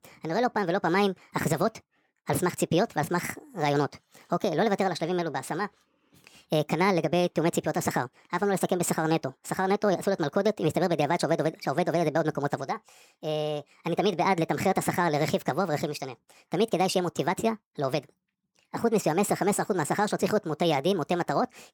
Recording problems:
wrong speed and pitch; too fast and too high; 1.5 times normal speed

